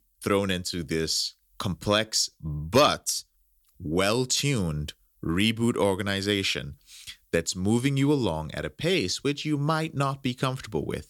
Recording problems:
none

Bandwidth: 18 kHz